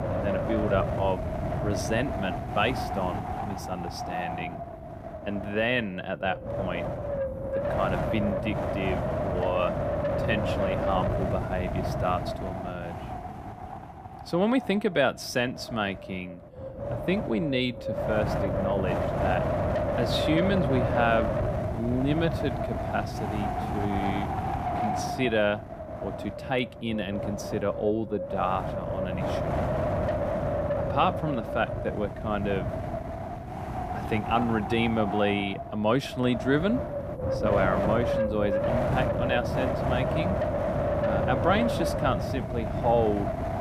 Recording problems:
wind noise on the microphone; heavy; 1 dB below the speech

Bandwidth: 15 kHz